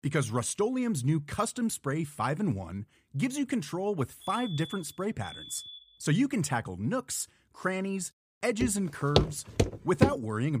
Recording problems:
alarm; faint; from 4 to 6 s; peak 10 dB below the speech
footsteps; loud; from 8.5 to 10 s; peak 3 dB above the speech
abrupt cut into speech; at the end

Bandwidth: 15 kHz